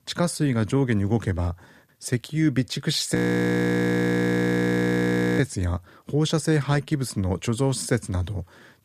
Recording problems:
audio freezing; at 3 s for 2 s

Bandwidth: 15 kHz